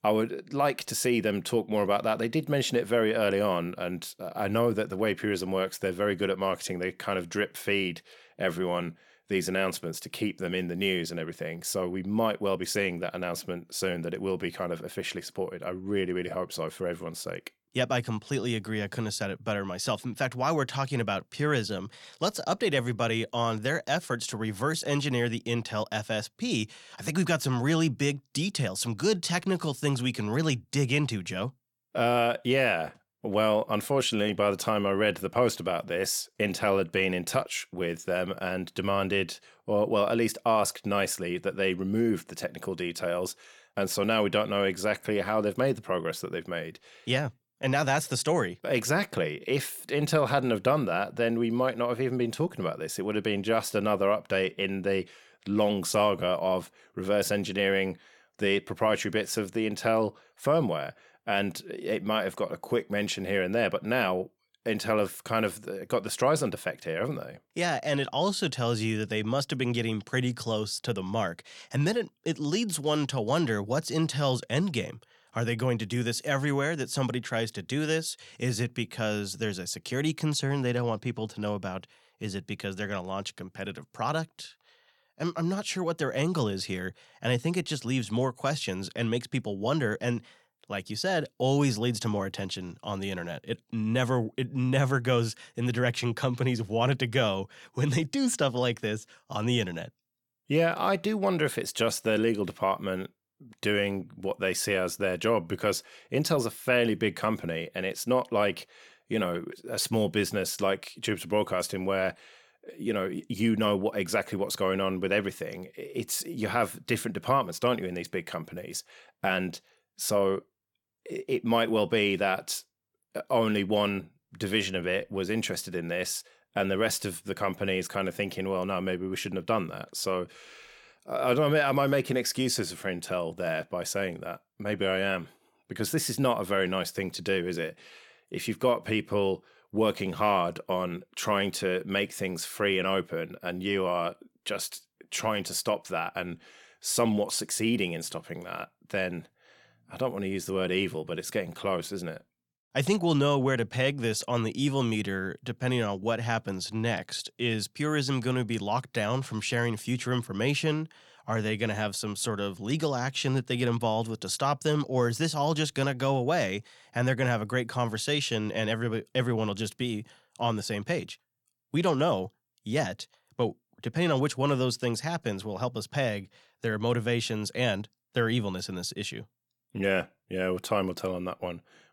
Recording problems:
none

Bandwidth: 17 kHz